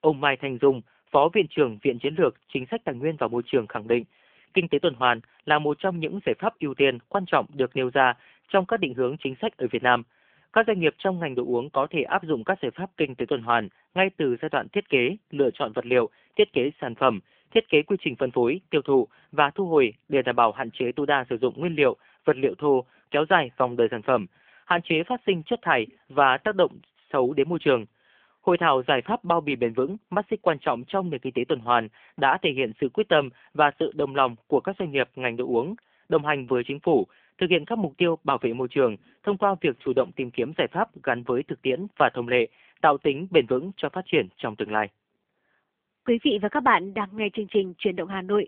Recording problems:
phone-call audio; nothing above 3.5 kHz

